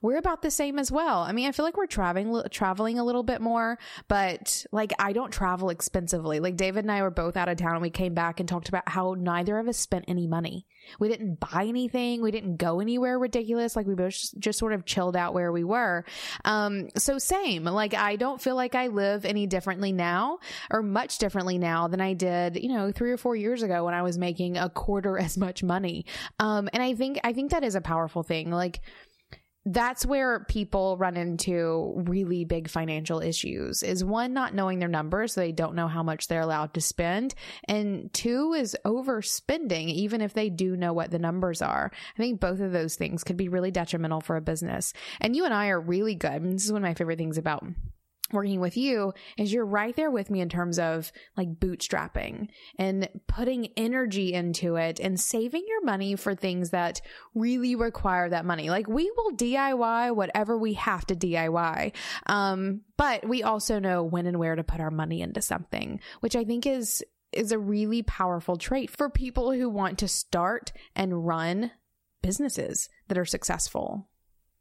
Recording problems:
squashed, flat; somewhat

